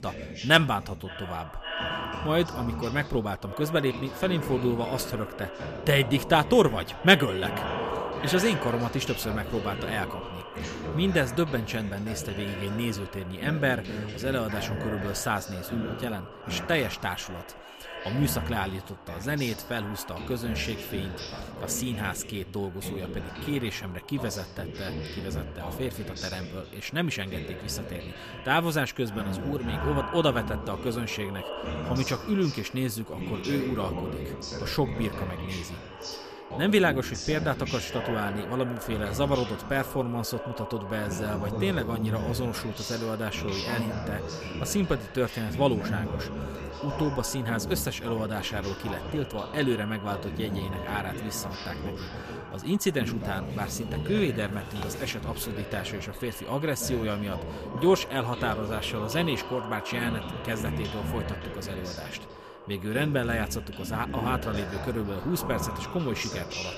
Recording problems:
echo of what is said; strong; throughout; 550 ms later, 10 dB below the speech
voice in the background; loud; throughout; 8 dB below the speech

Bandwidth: 14.5 kHz